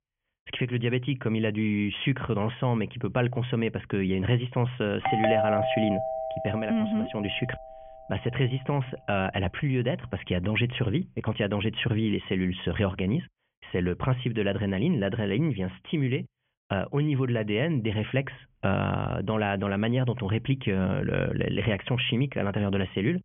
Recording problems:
high frequencies cut off; severe; nothing above 3.5 kHz
doorbell; loud; from 5 to 7 s; peak 3 dB above the speech

